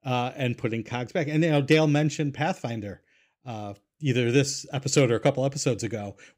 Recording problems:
none

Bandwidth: 15.5 kHz